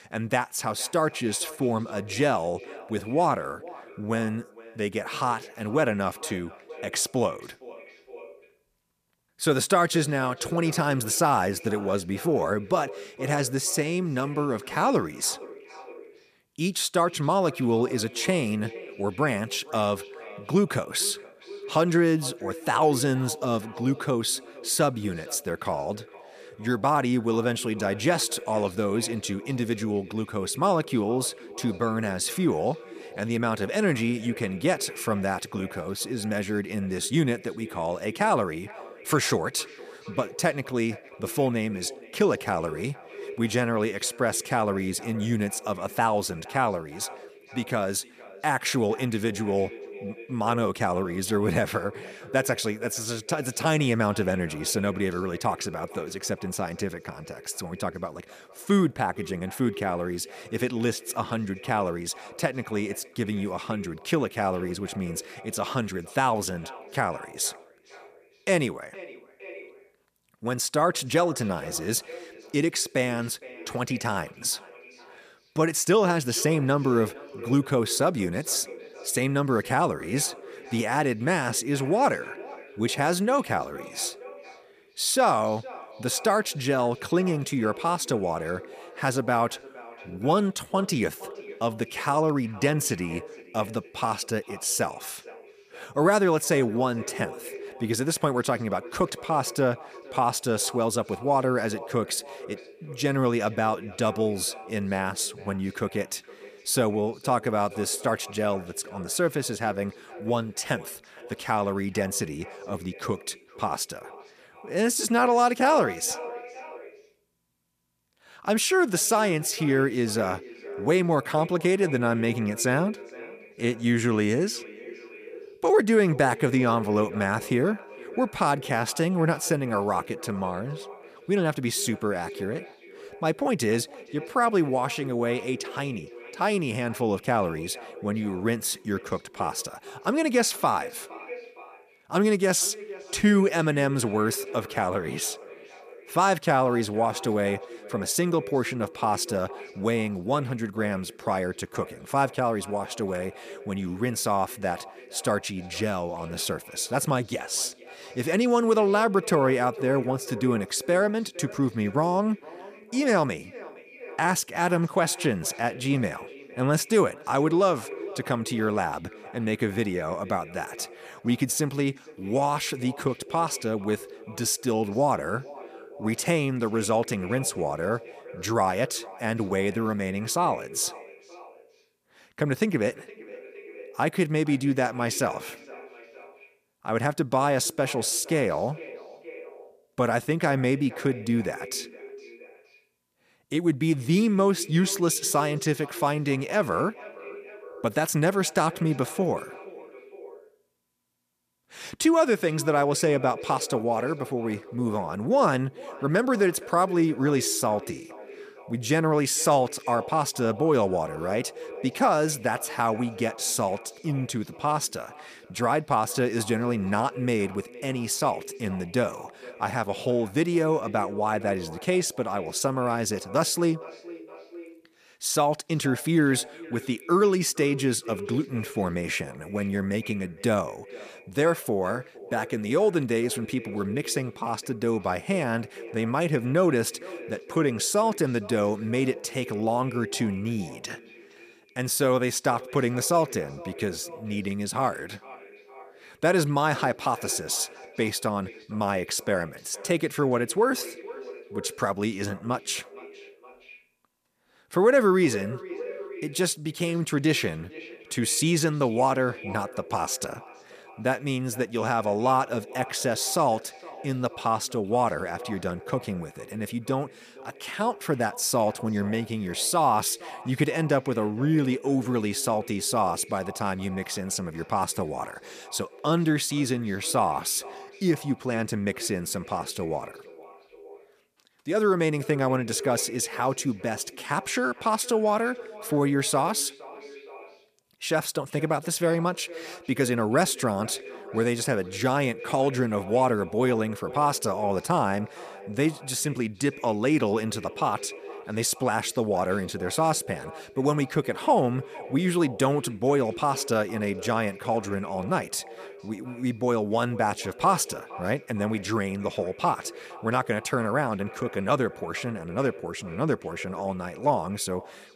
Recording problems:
echo of what is said; noticeable; throughout; 460 ms later, 15 dB below the speech

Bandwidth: 14.5 kHz